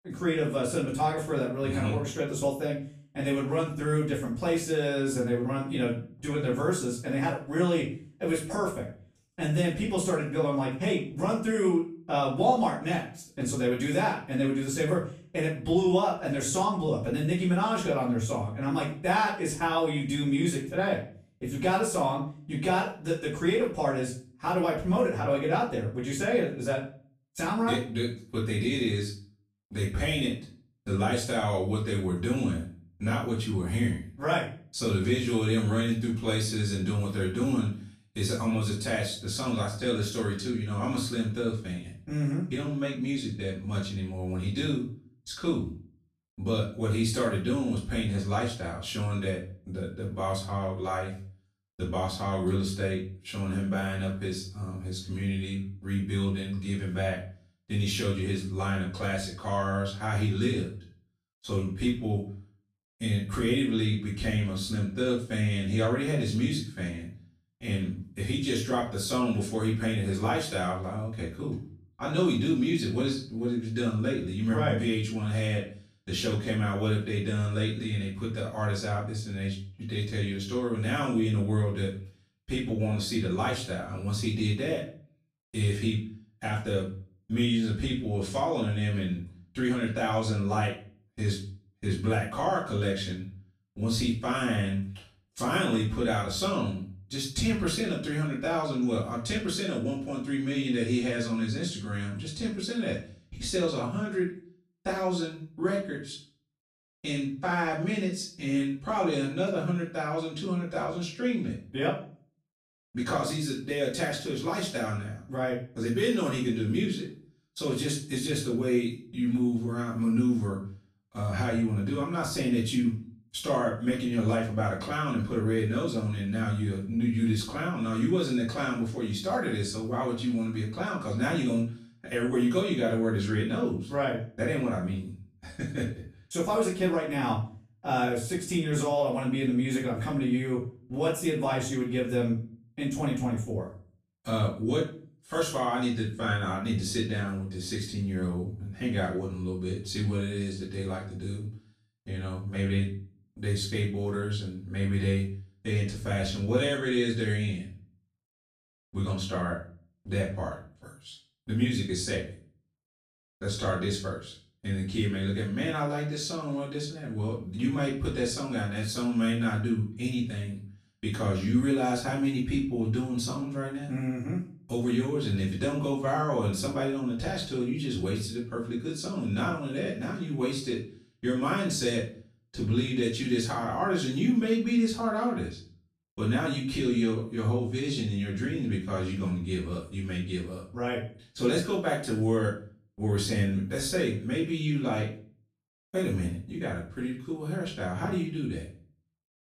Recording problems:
off-mic speech; far
room echo; noticeable; dies away in 0.4 s

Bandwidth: 14.5 kHz